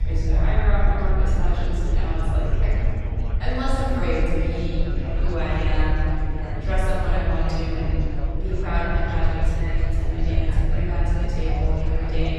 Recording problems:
room echo; strong; dies away in 2.8 s
off-mic speech; far
chatter from many people; loud; throughout; 9 dB below the speech
low rumble; noticeable; throughout; 15 dB below the speech

